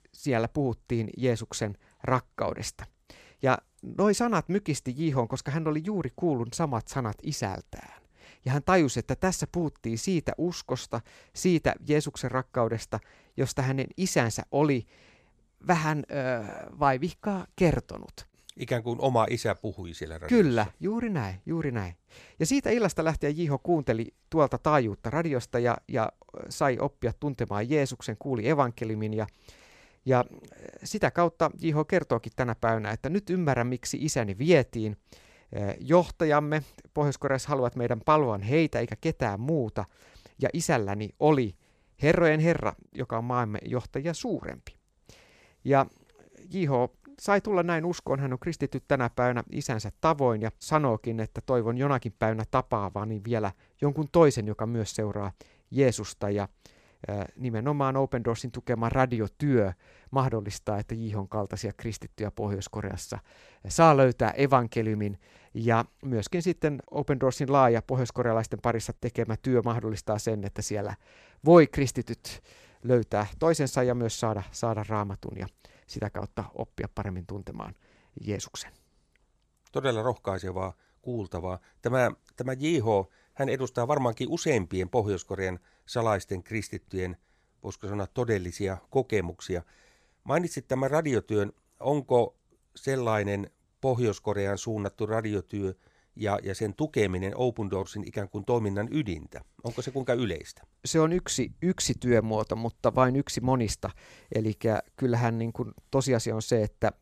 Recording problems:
none

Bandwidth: 14.5 kHz